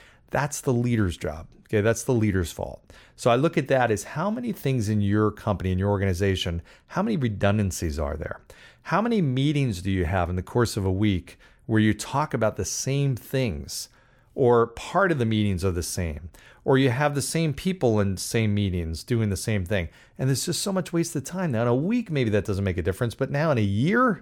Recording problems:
none

